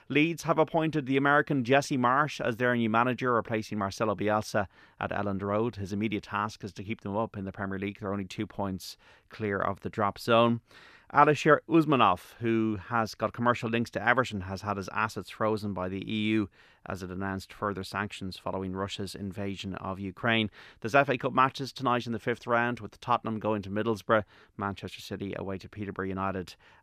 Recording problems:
none

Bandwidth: 14.5 kHz